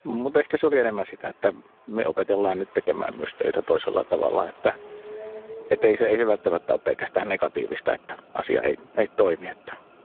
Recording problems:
phone-call audio; poor line
traffic noise; faint; throughout; 20 dB below the speech

